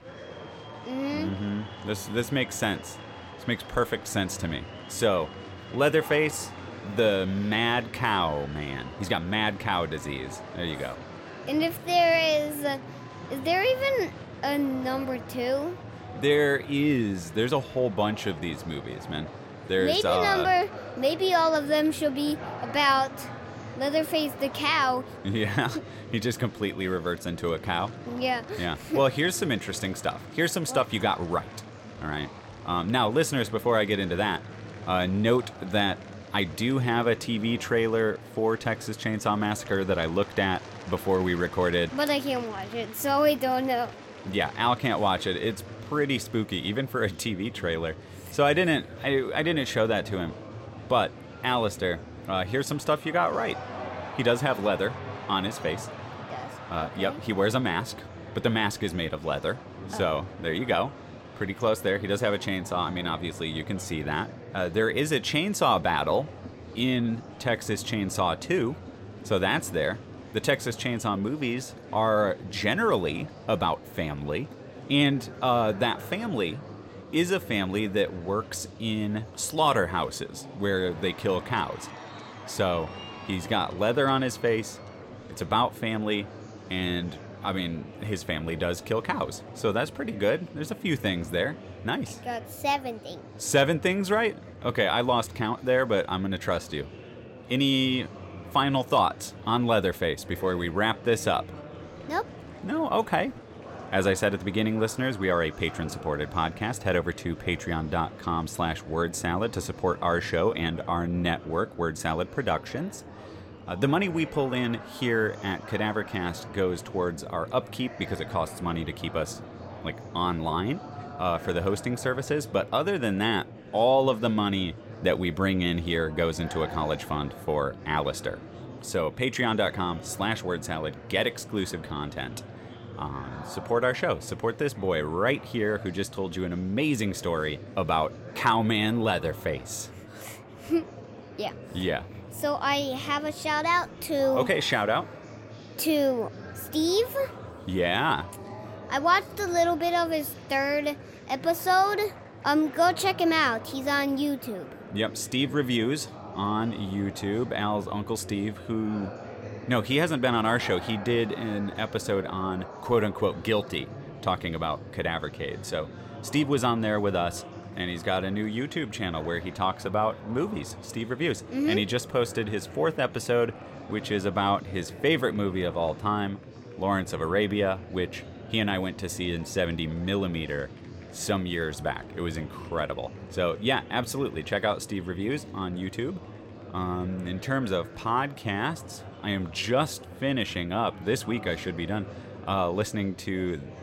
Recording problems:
murmuring crowd; noticeable; throughout; 15 dB below the speech

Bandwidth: 16.5 kHz